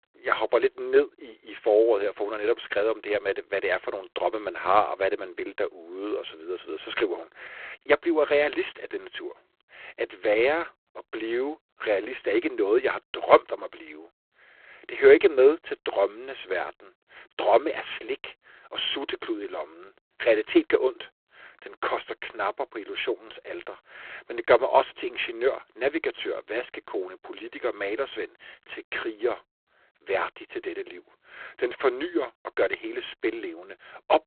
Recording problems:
phone-call audio; poor line

